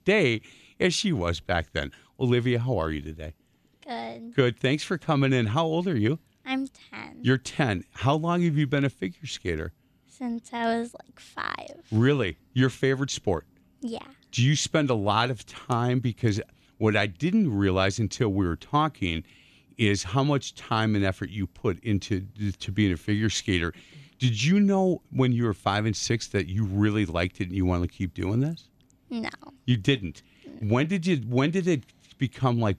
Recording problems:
none

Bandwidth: 13.5 kHz